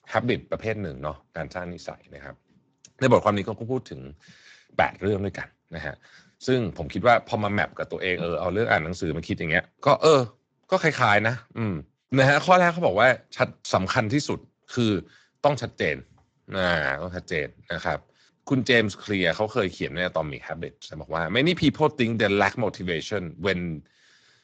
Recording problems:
garbled, watery; slightly; nothing above 7.5 kHz

